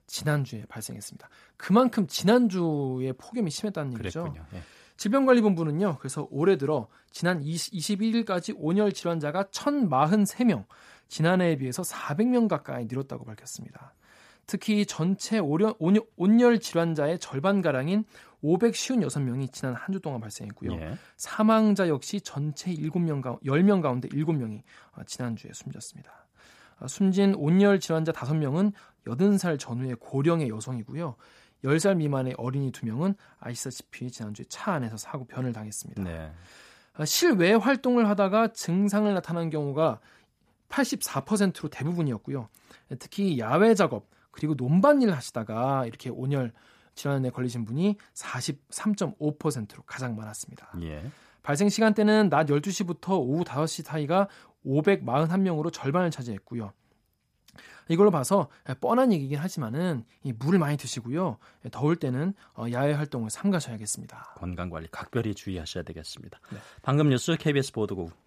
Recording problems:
none

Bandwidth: 14.5 kHz